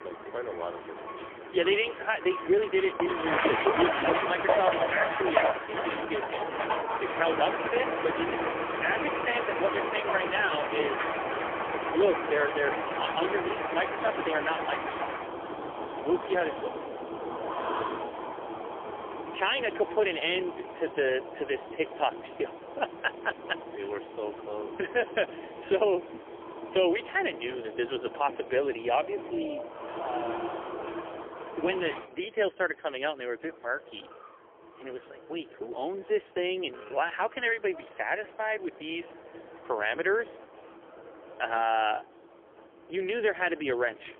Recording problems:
phone-call audio; poor line; nothing above 3.5 kHz
traffic noise; loud; throughout; 3 dB below the speech

